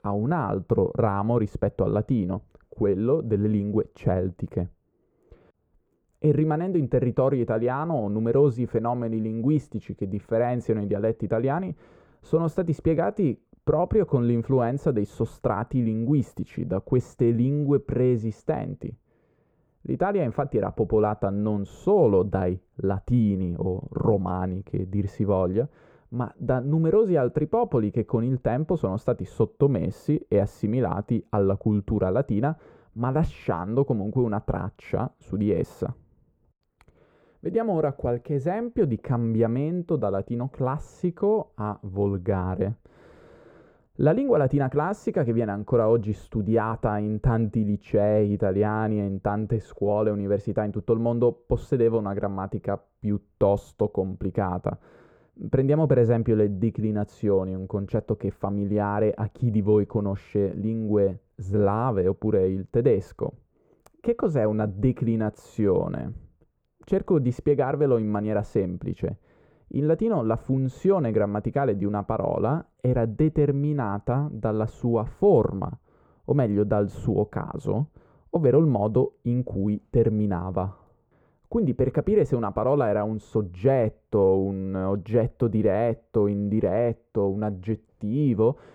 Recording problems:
muffled; very; fading above 2 kHz

